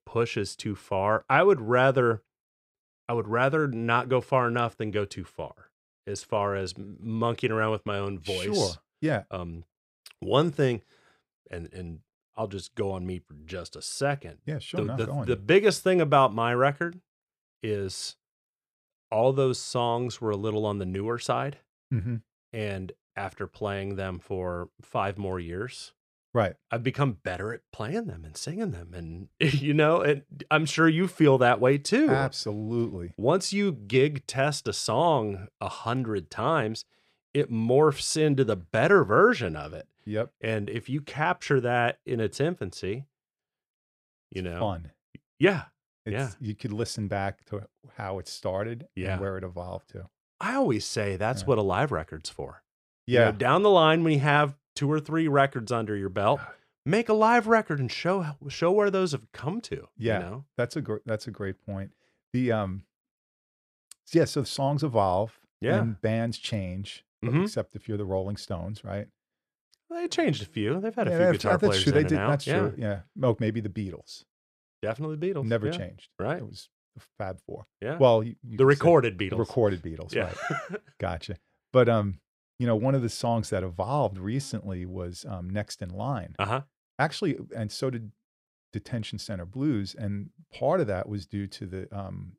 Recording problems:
none

